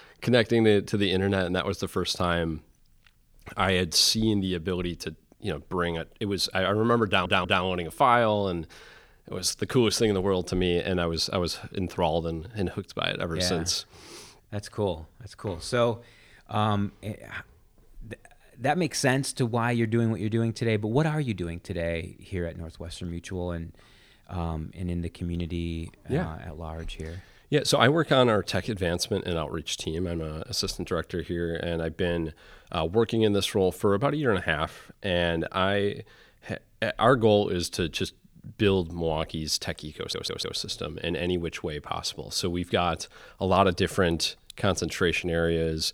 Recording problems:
audio stuttering; at 7 s and at 40 s

